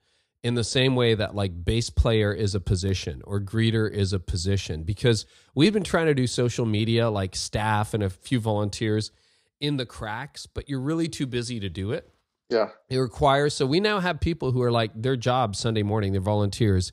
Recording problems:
none

